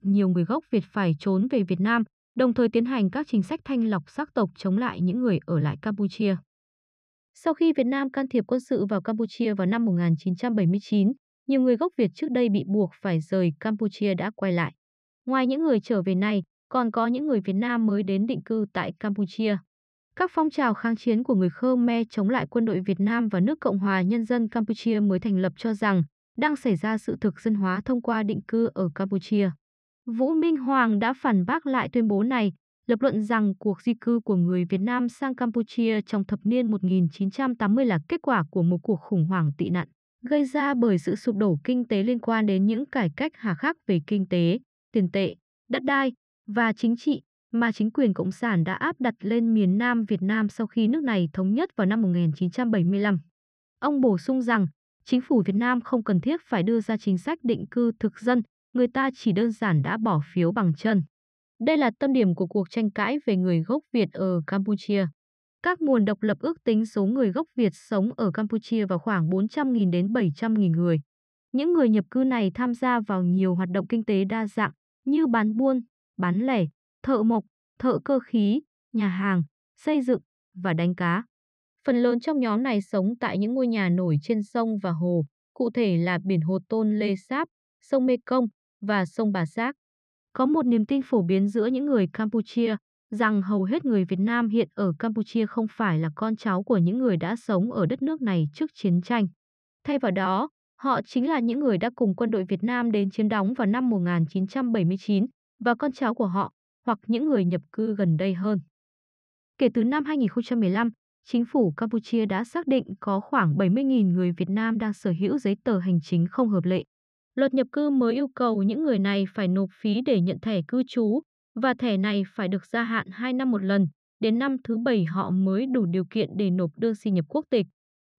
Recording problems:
muffled; slightly; fading above 2.5 kHz

